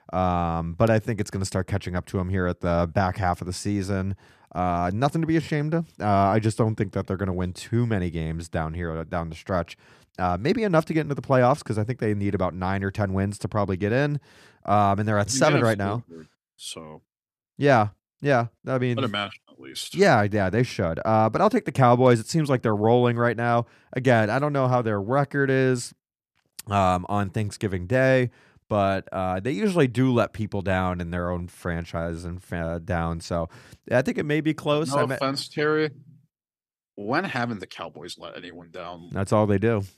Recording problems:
none

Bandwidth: 14.5 kHz